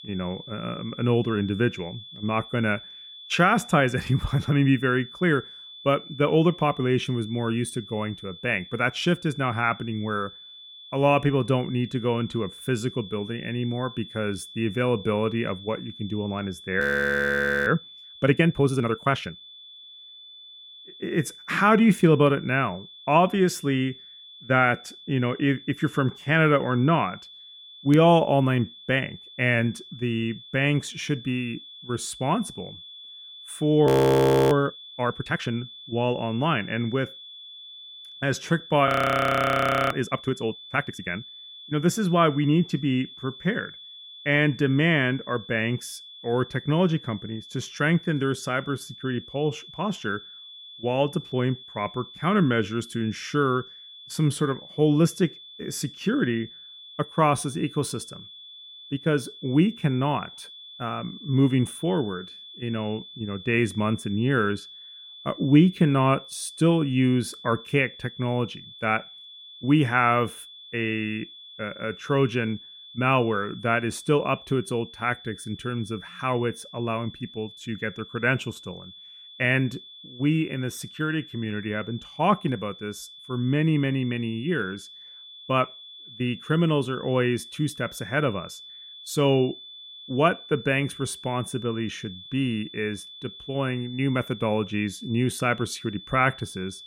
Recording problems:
muffled; slightly; fading above 3 kHz
high-pitched whine; noticeable; throughout; 3.5 kHz, 15 dB below the speech
audio freezing; at 17 s for 1 s, at 34 s for 0.5 s and at 39 s for 1 s

